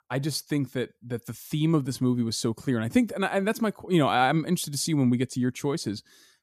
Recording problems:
none

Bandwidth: 14.5 kHz